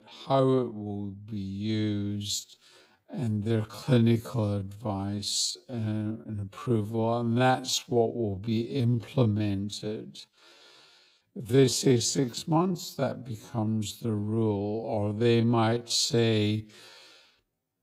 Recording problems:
wrong speed, natural pitch; too slow; 0.5 times normal speed

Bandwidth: 15.5 kHz